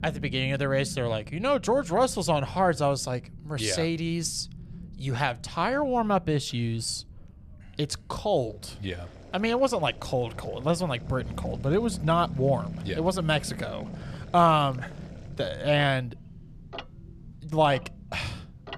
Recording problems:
household noises; faint; from 9 s on; 20 dB below the speech
low rumble; faint; throughout; 25 dB below the speech

